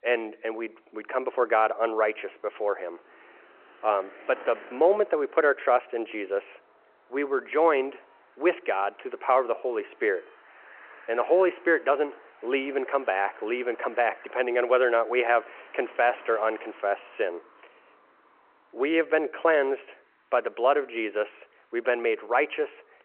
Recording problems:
phone-call audio
traffic noise; faint; throughout; 25 dB below the speech

